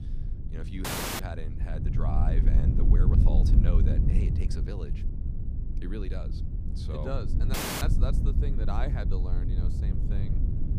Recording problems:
low rumble; loud; throughout; 1 dB below the speech
audio cutting out; at 1 s and at 7.5 s

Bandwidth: 15 kHz